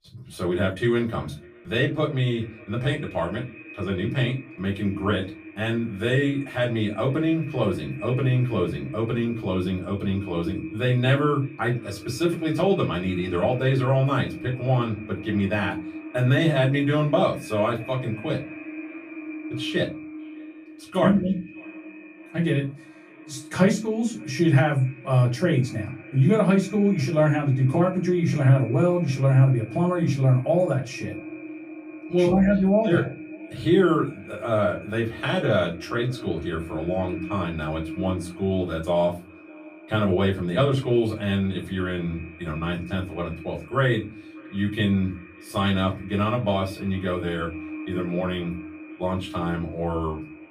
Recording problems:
off-mic speech; far
echo of what is said; noticeable; throughout; 600 ms later, 15 dB below the speech
room echo; very slight; dies away in 0.2 s

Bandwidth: 15 kHz